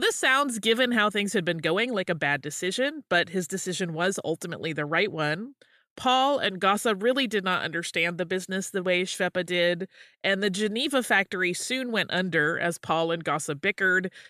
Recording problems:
abrupt cut into speech; at the start

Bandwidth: 14.5 kHz